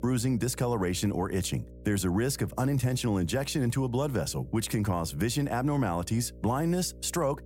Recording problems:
electrical hum; faint; throughout; 60 Hz, 25 dB below the speech

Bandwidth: 16 kHz